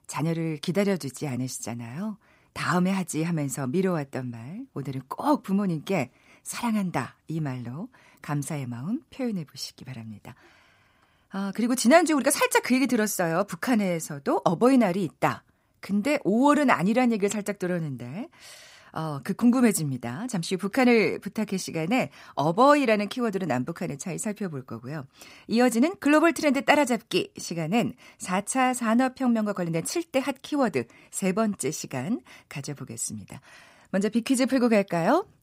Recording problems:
none

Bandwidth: 15.5 kHz